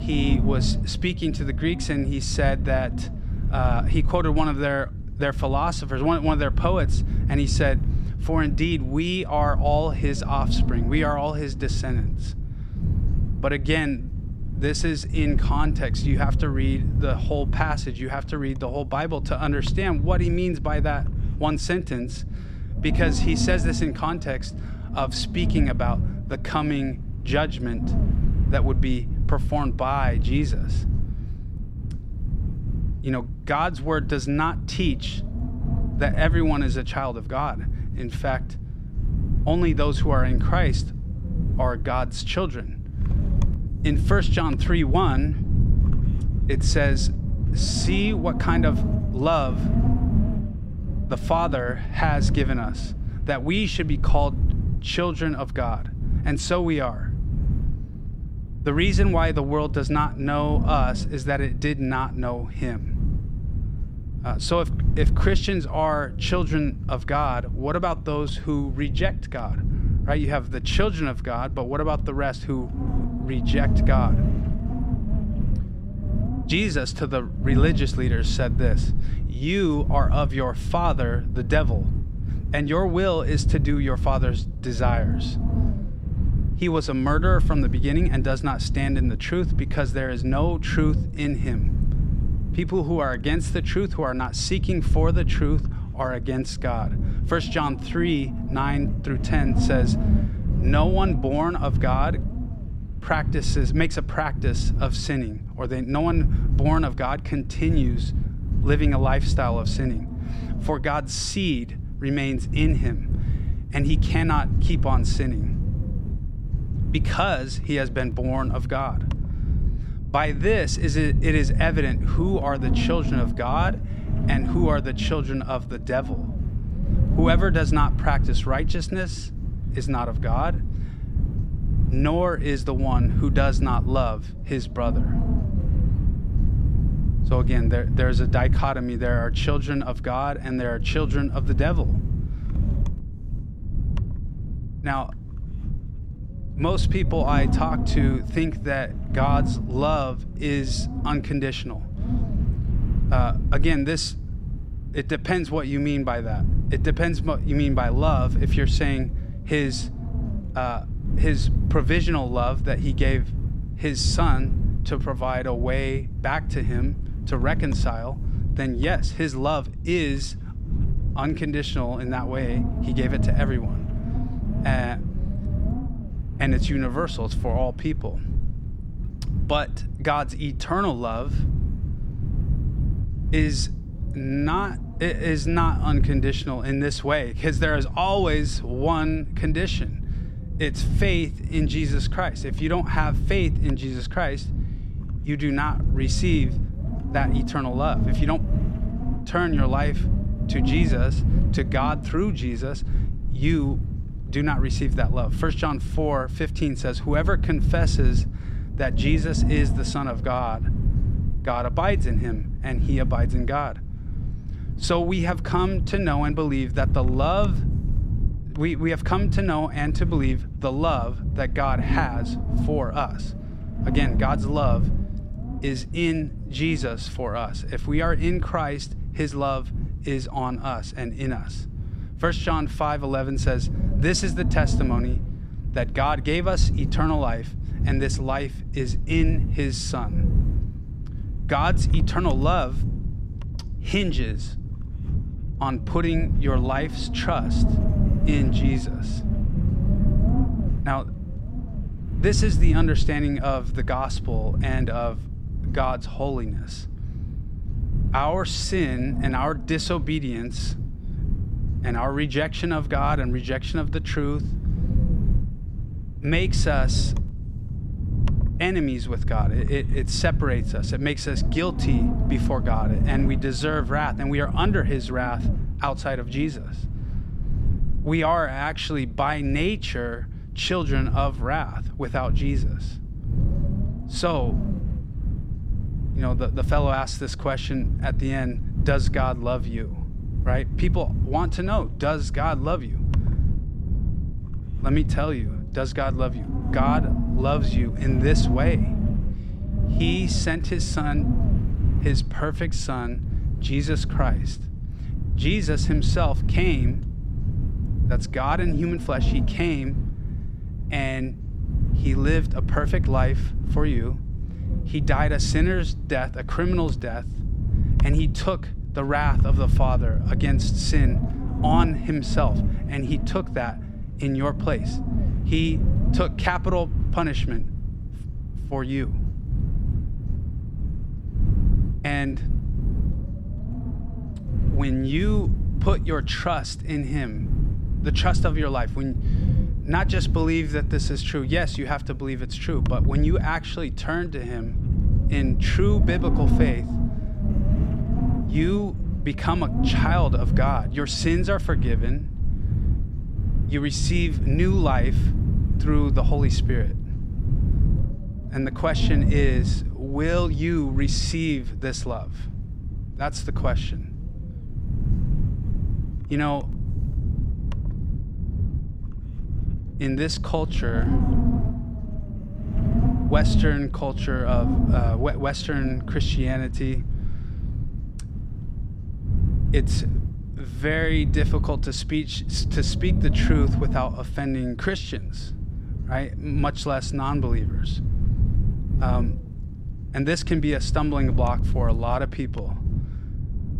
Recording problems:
wind noise on the microphone; occasional gusts; 10 dB below the speech

